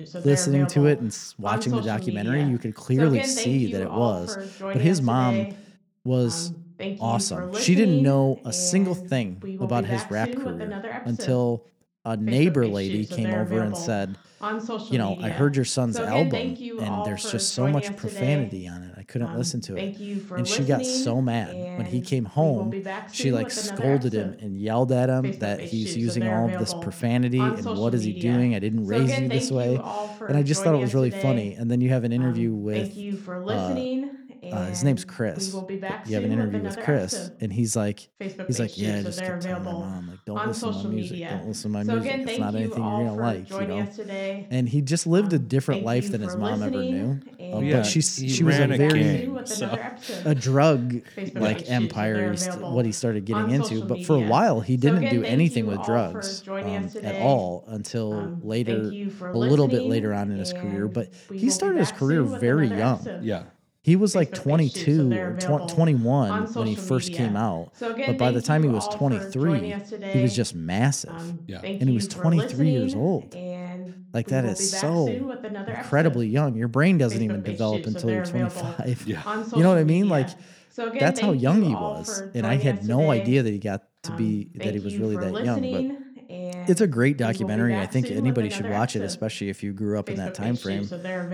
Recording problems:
voice in the background; loud; throughout; 8 dB below the speech

